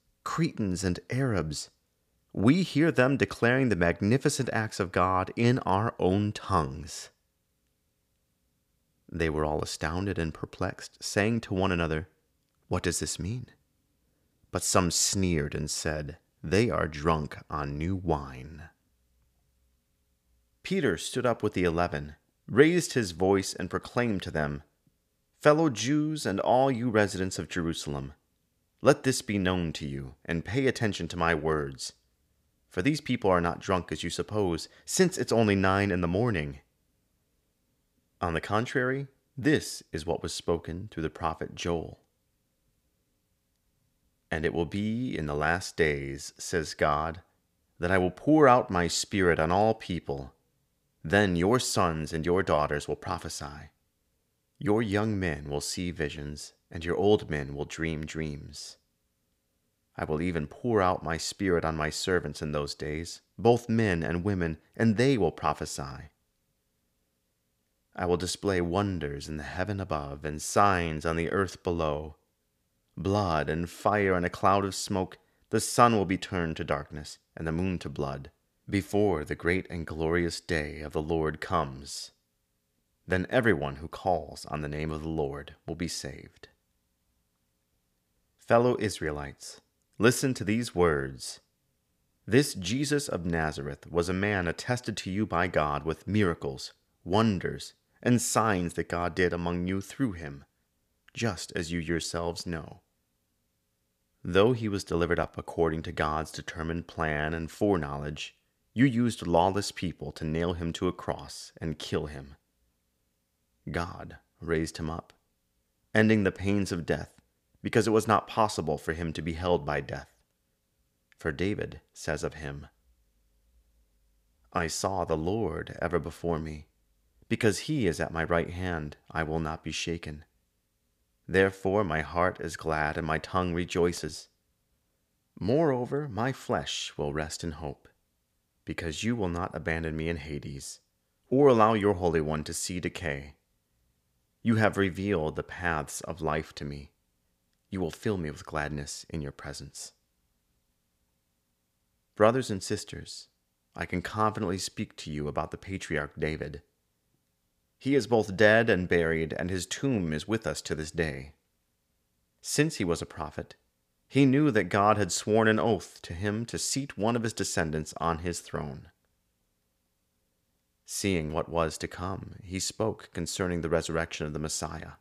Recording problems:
none

